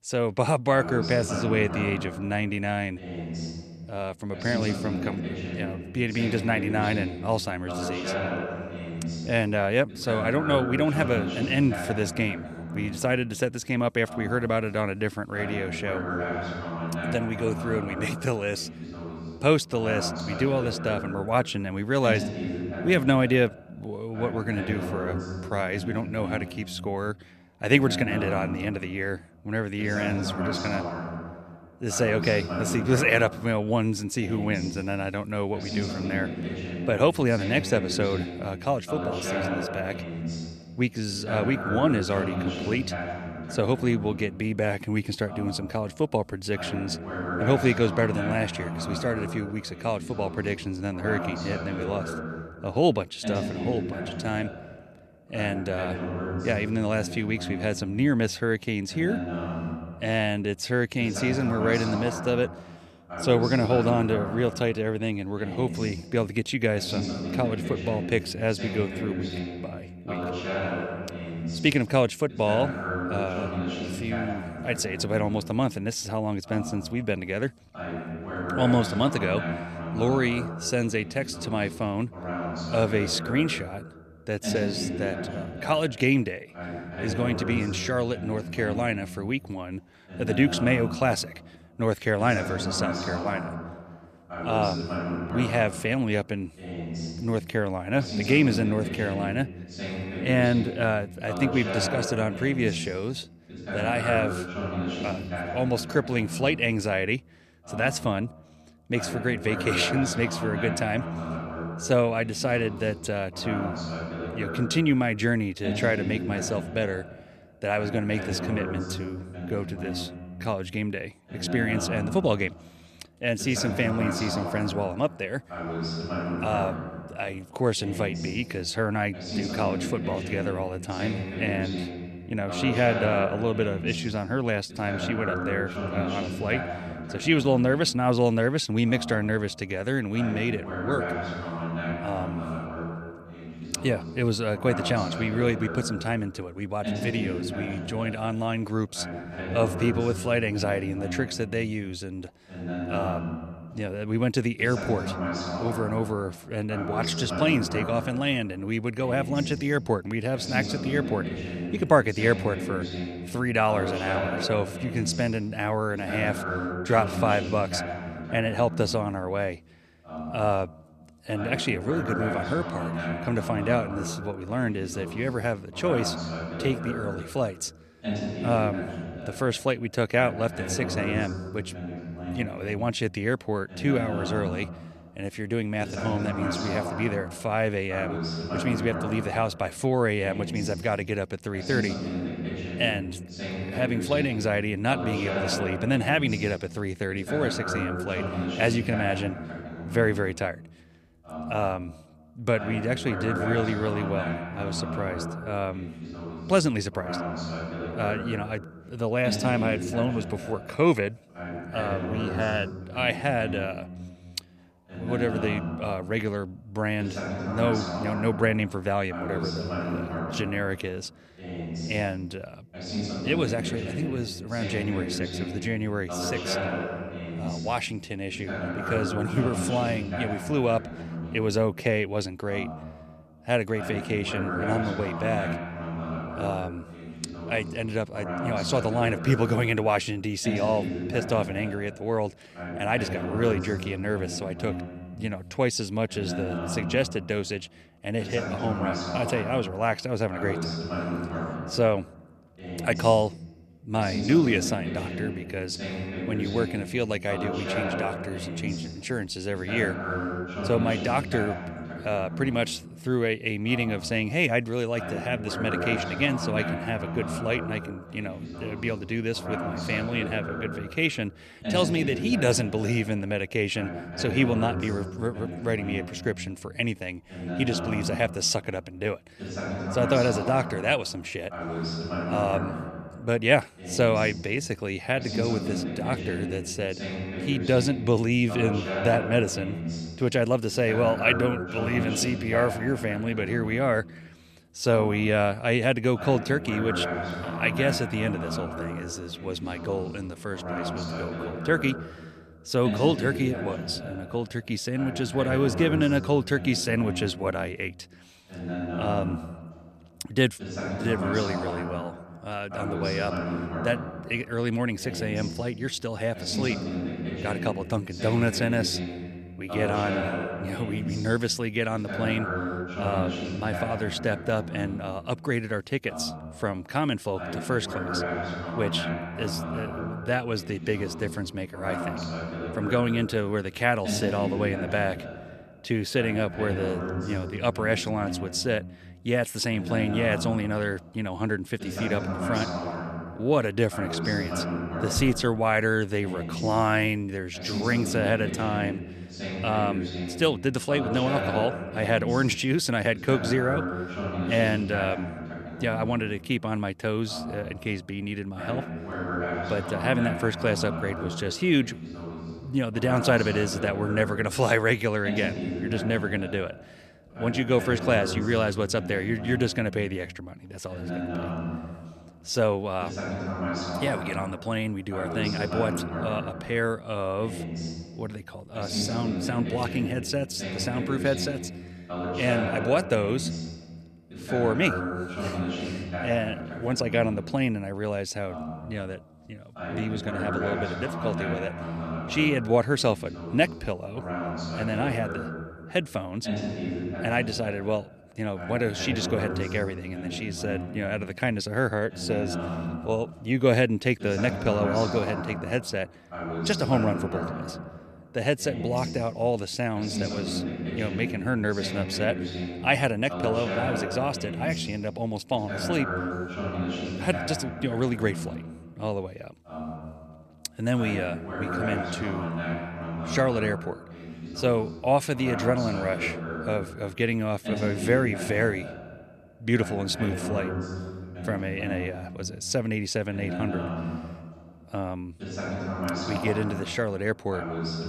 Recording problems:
voice in the background; loud; throughout; 6 dB below the speech

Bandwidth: 14.5 kHz